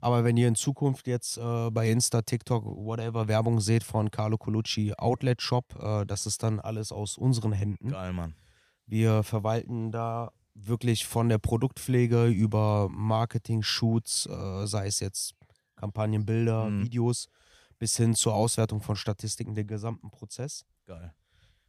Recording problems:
none

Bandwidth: 15 kHz